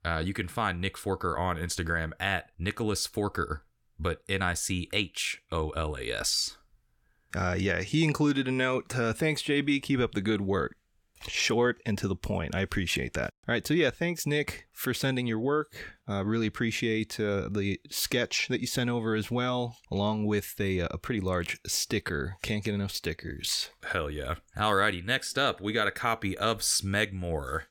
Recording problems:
none

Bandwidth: 17 kHz